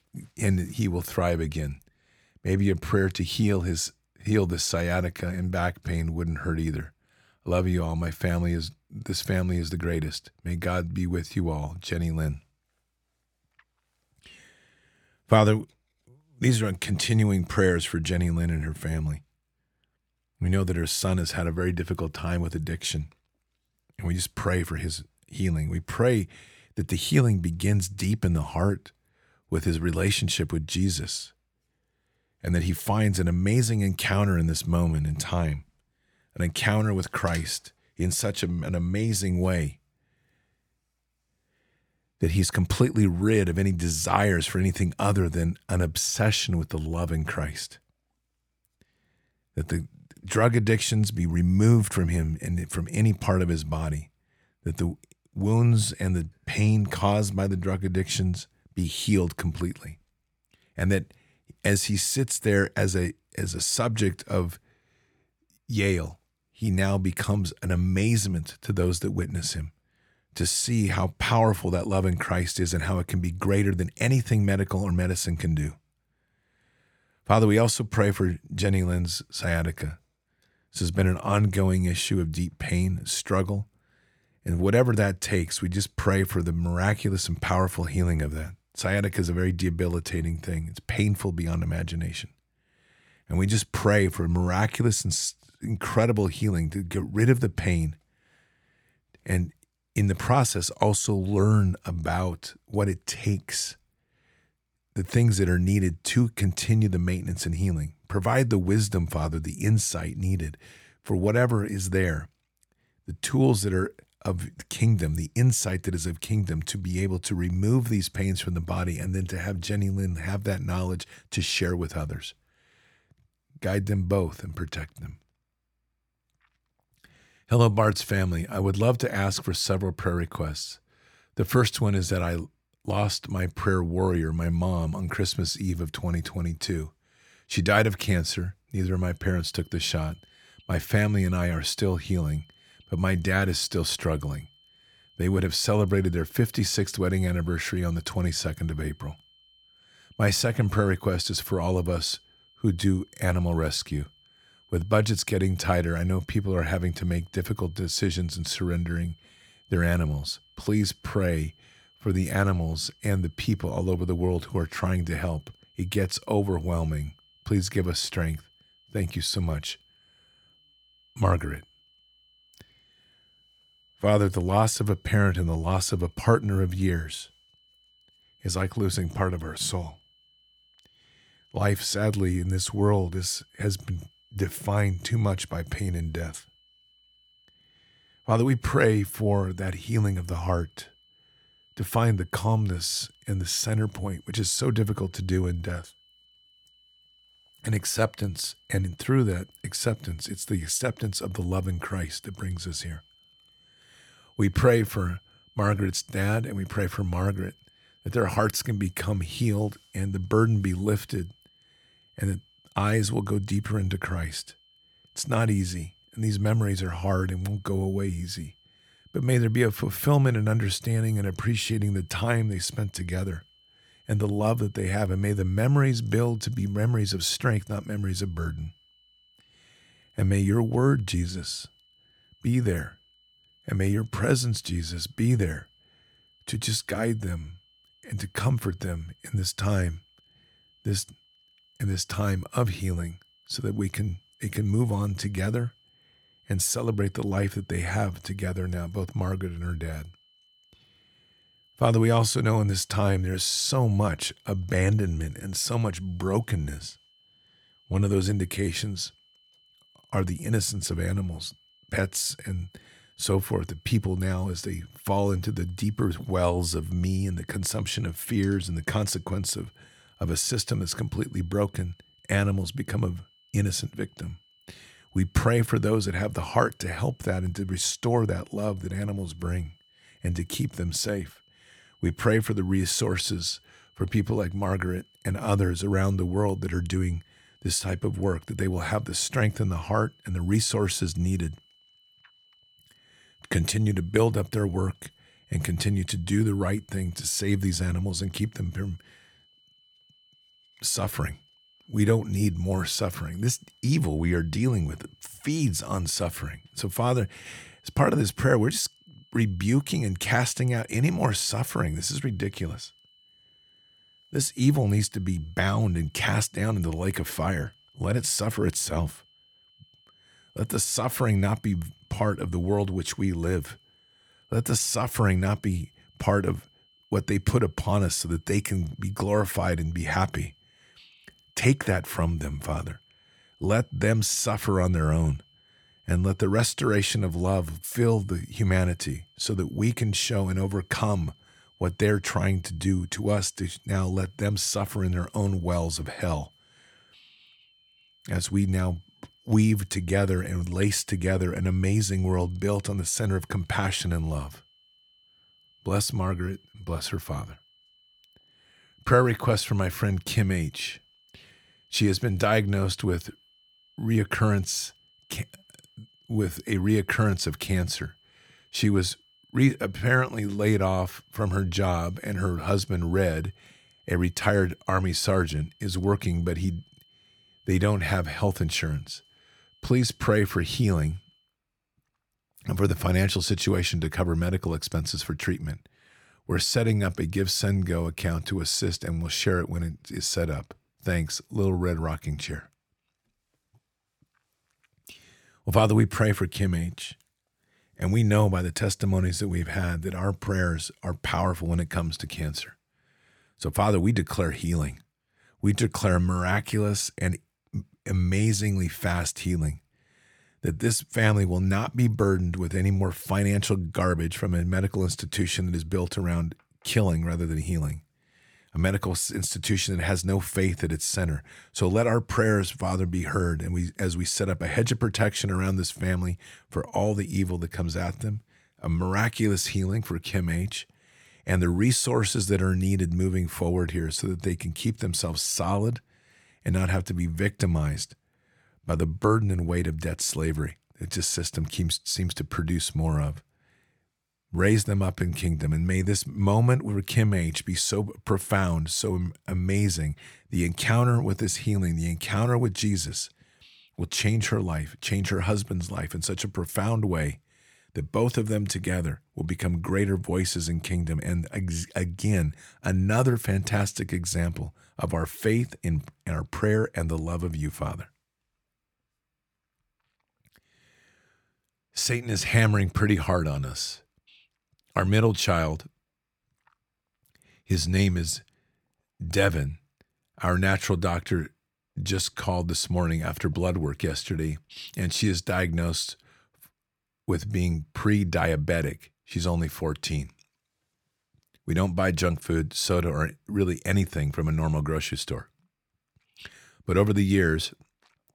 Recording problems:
high-pitched whine; faint; from 2:19 to 6:21; 3 kHz, 35 dB below the speech

